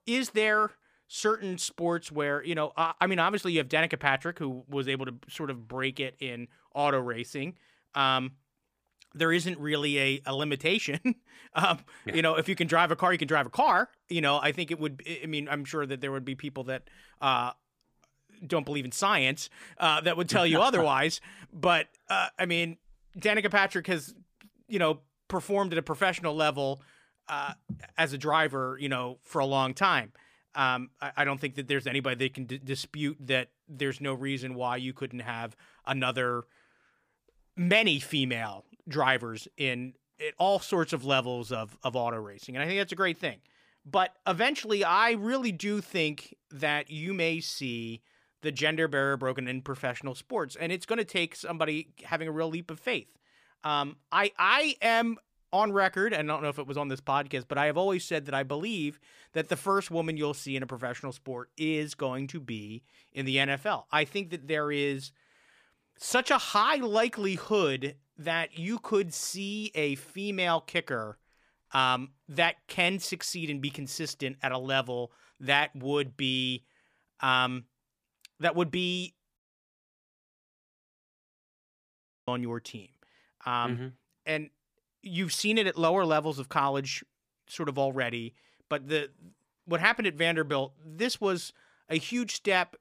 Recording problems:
audio cutting out; at 1:19 for 3 s

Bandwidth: 15 kHz